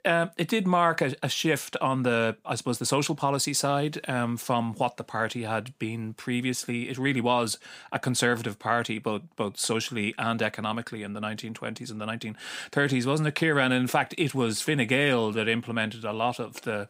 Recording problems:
none

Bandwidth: 15.5 kHz